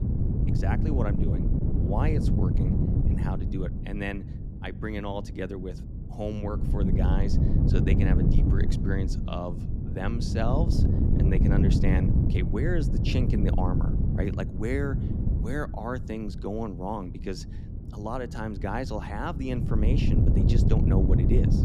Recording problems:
wind noise on the microphone; heavy; 1 dB below the speech

